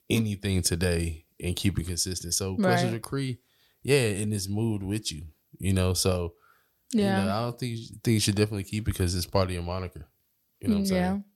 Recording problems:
none

